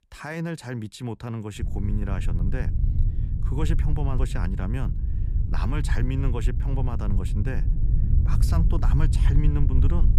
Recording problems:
low rumble; loud; from 1.5 s on; 6 dB below the speech

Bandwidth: 14.5 kHz